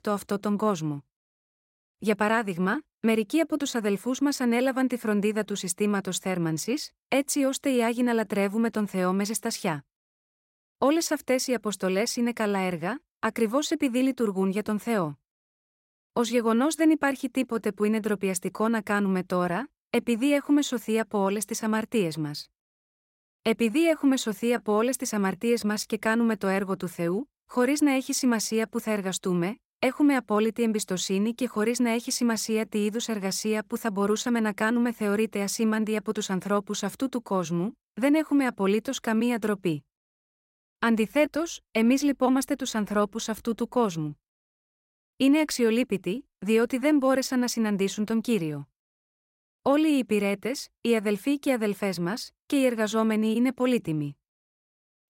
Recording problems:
none

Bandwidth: 16 kHz